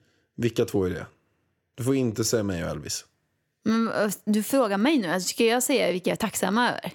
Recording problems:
uneven, jittery; slightly; from 0.5 to 6.5 s

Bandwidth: 17 kHz